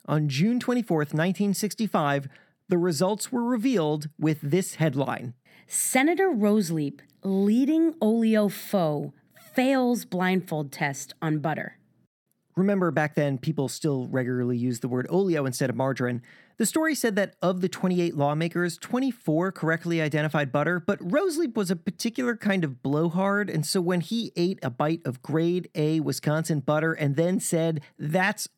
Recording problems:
none

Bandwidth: 18 kHz